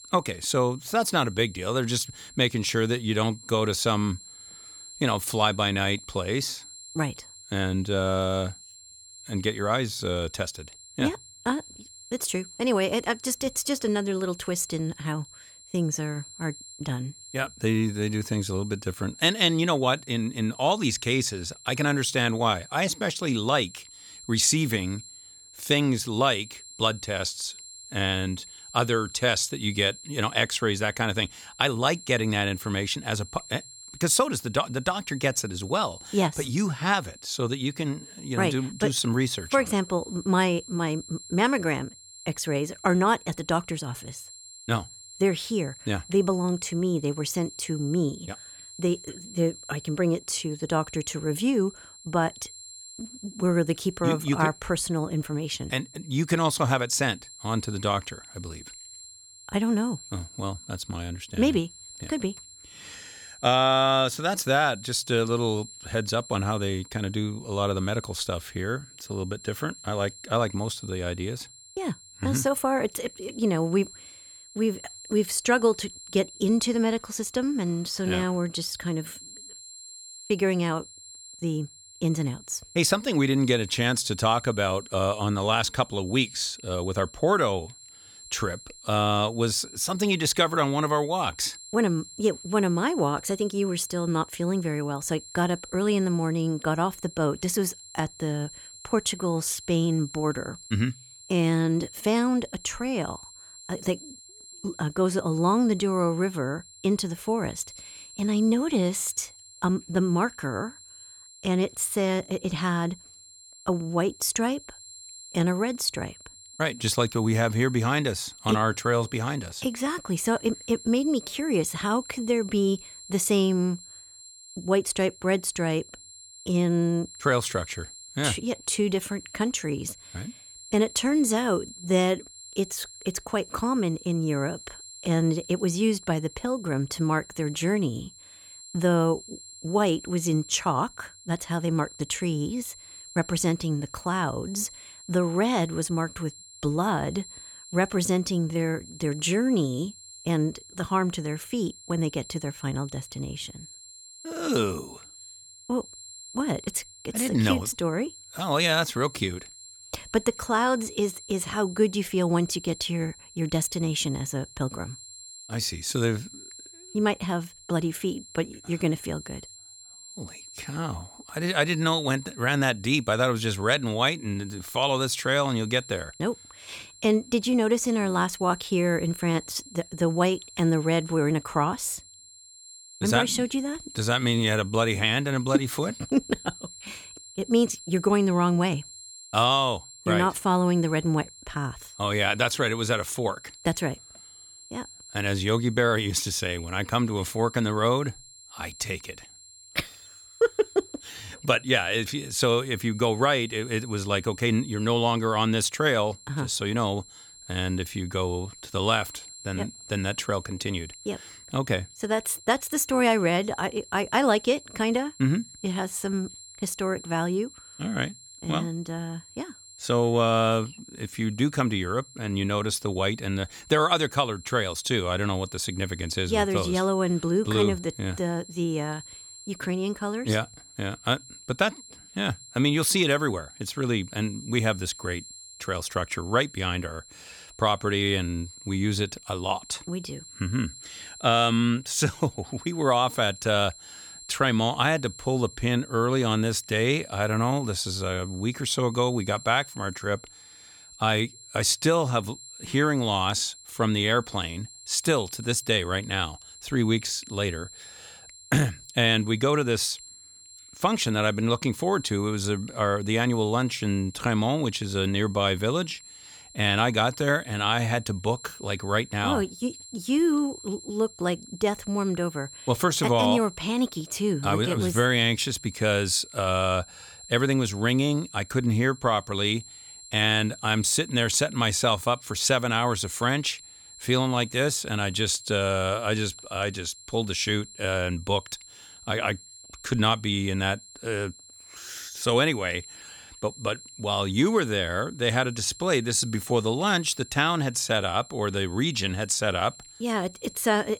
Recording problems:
high-pitched whine; noticeable; throughout; 7.5 kHz, 20 dB below the speech

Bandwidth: 18.5 kHz